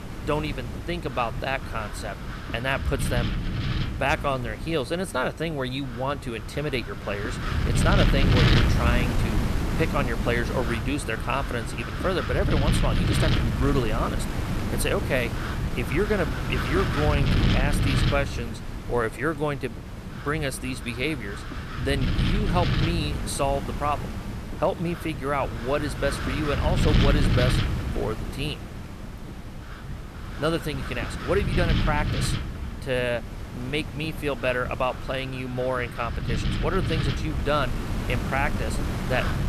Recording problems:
wind noise on the microphone; heavy; 5 dB below the speech

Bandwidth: 14 kHz